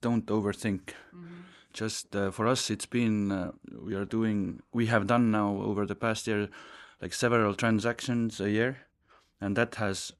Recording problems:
none

